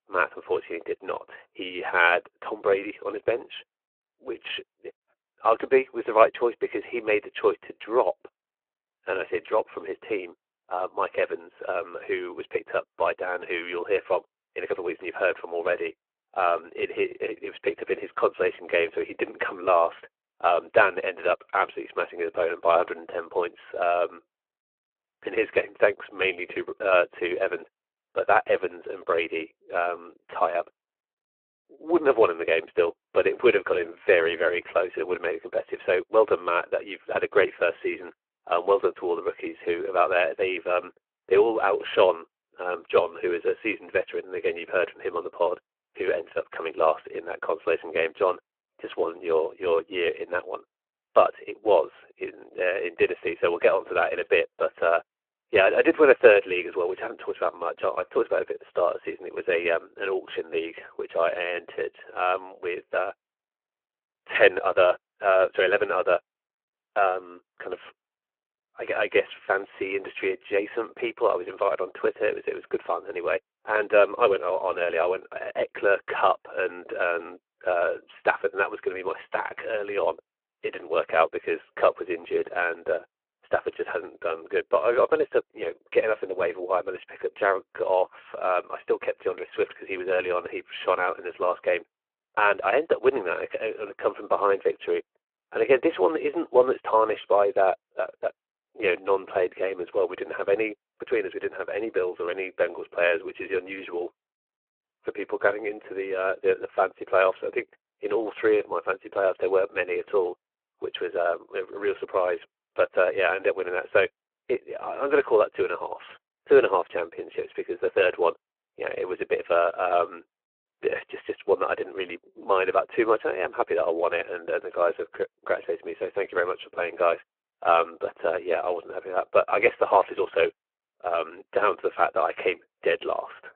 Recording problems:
phone-call audio

